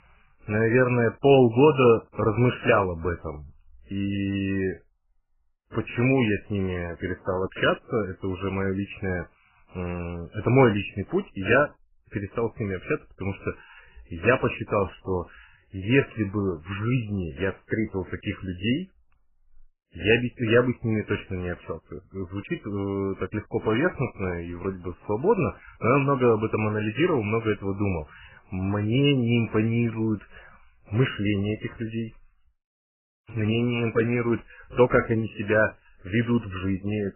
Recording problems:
garbled, watery; badly; nothing above 3 kHz

